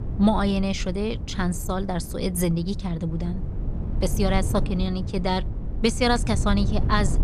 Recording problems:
wind noise on the microphone; occasional gusts; 15 dB below the speech

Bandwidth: 14.5 kHz